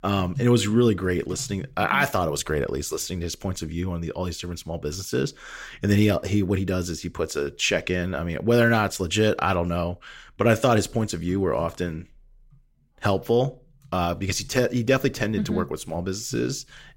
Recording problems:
none

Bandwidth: 16 kHz